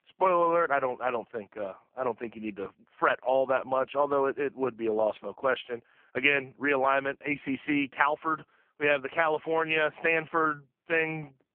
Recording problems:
phone-call audio; poor line

